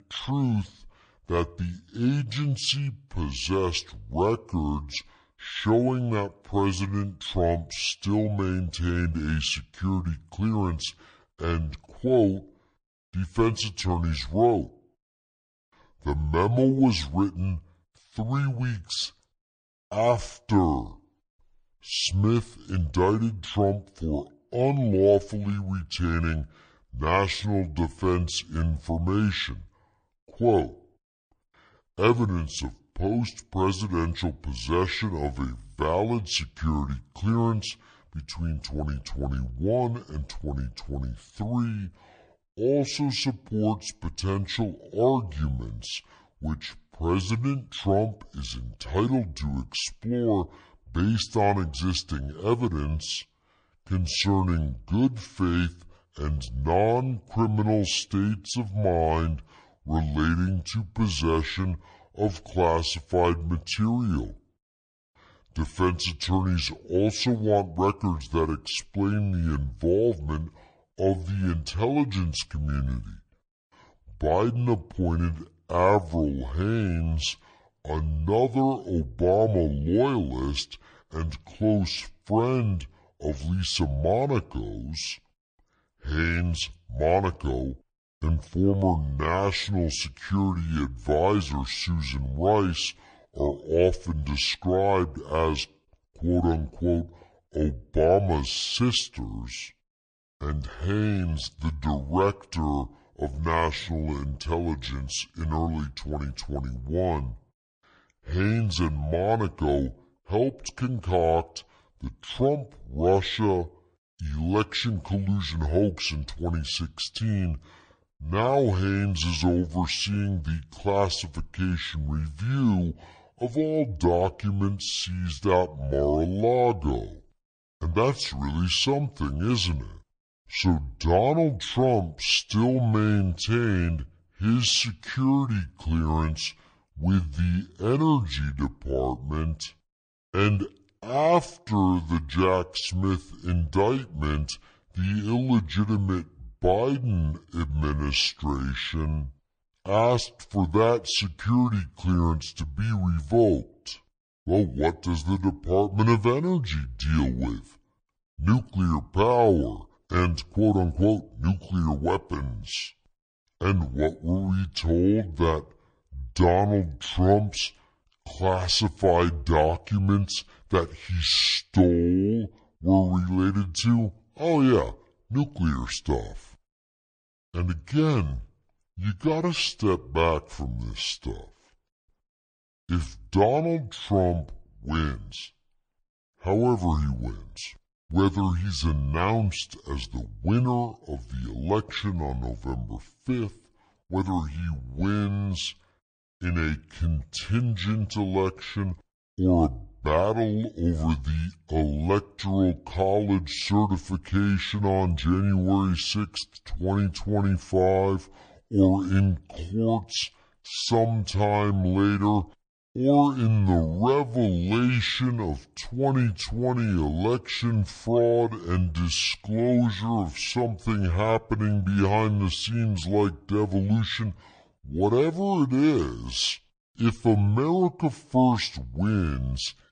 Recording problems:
wrong speed and pitch; too slow and too low; 0.6 times normal speed

